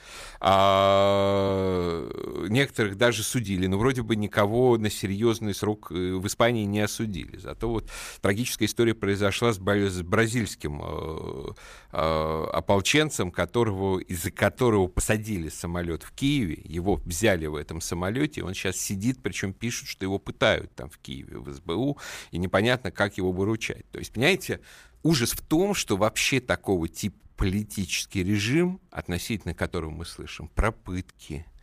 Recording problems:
uneven, jittery; strongly; from 1 to 30 s

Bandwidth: 15 kHz